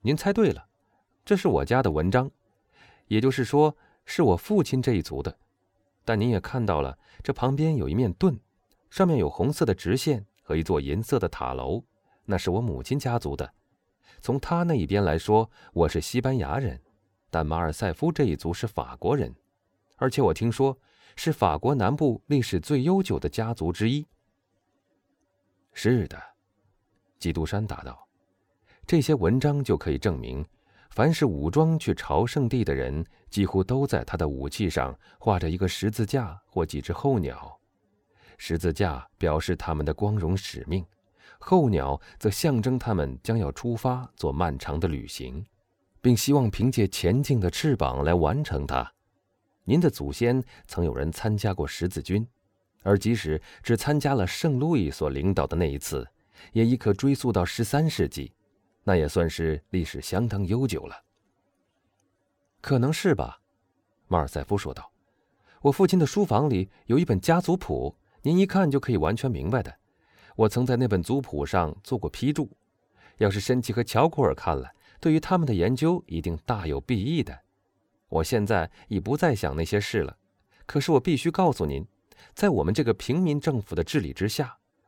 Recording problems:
none

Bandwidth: 17.5 kHz